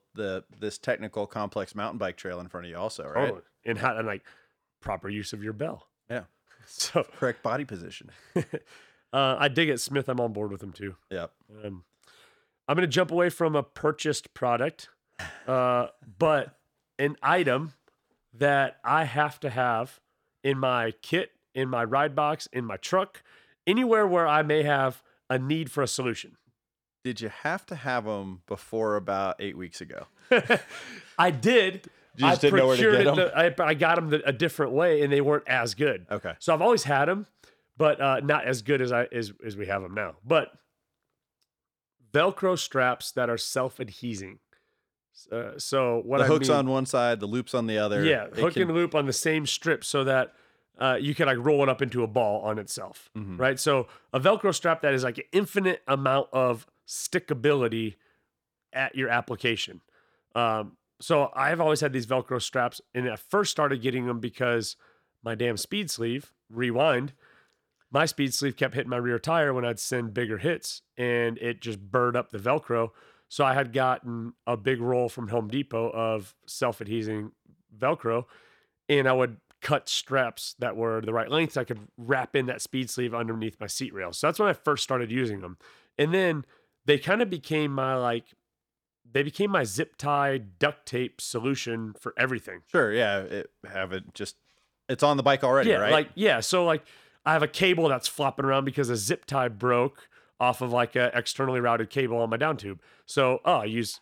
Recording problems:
none

